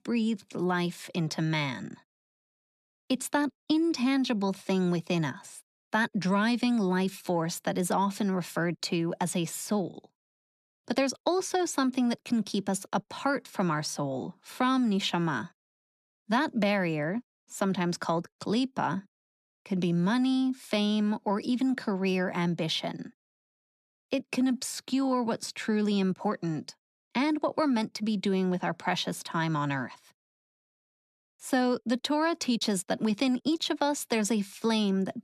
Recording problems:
none

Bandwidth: 13.5 kHz